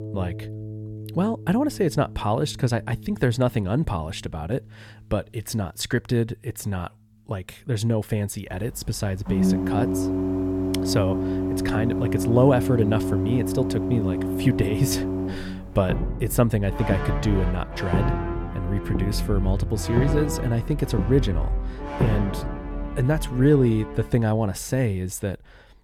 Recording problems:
background music; loud; throughout; 2 dB below the speech

